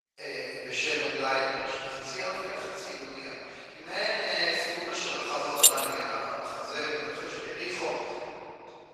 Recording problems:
room echo; strong; dies away in 3 s
off-mic speech; far
thin; very; fading below 800 Hz
garbled, watery; slightly; nothing above 14.5 kHz
jangling keys; loud; at 5.5 s; peak 10 dB above the speech

